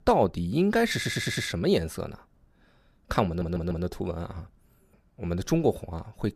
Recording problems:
audio stuttering; at 1 s and at 3.5 s

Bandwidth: 14.5 kHz